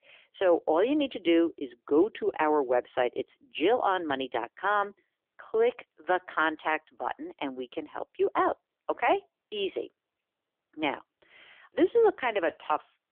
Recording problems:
phone-call audio; poor line; nothing above 3.5 kHz

